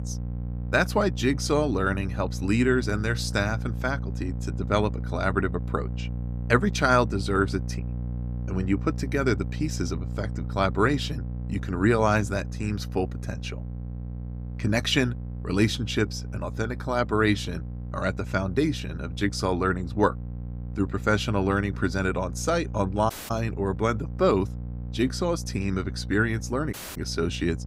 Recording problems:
electrical hum; noticeable; throughout; 60 Hz, 20 dB below the speech
audio cutting out; at 23 s and at 27 s

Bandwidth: 15.5 kHz